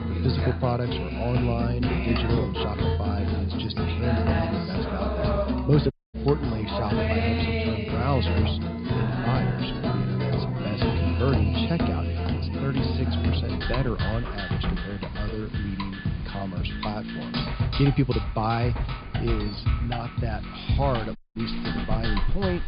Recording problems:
high frequencies cut off; severe; nothing above 5 kHz
background music; very loud; throughout; 2 dB above the speech
rain or running water; noticeable; throughout; 15 dB below the speech
low rumble; noticeable; throughout; 10 dB below the speech
audio cutting out; at 6 s and at 21 s

